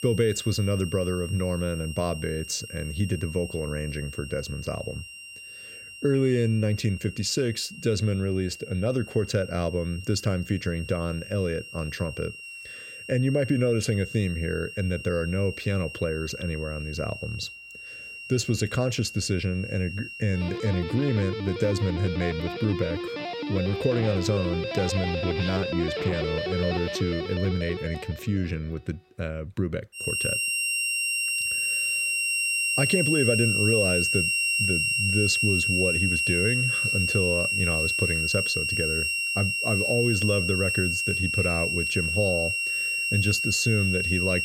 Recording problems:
background music; very loud; throughout; 2 dB above the speech

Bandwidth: 16 kHz